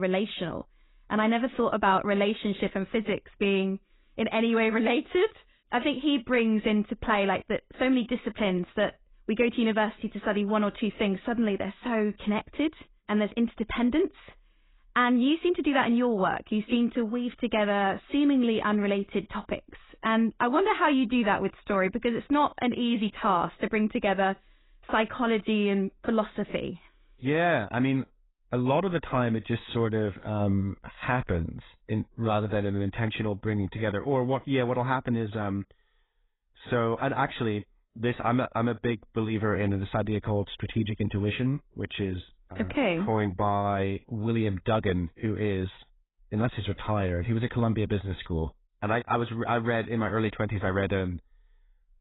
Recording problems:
garbled, watery; badly; nothing above 4 kHz
abrupt cut into speech; at the start

